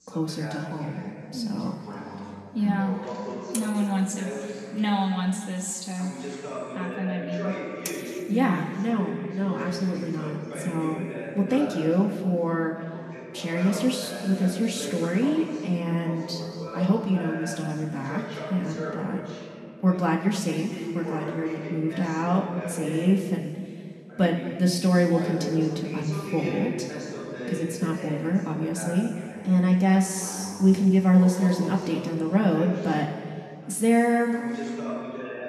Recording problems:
room echo; noticeable; dies away in 2 s
off-mic speech; somewhat distant
garbled, watery; slightly; nothing above 12.5 kHz
voice in the background; noticeable; throughout; 10 dB below the speech

